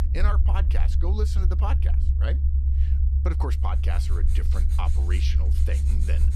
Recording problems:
low rumble; loud; throughout; 5 dB below the speech
household noises; noticeable; from 4 s on; 15 dB below the speech

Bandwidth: 14 kHz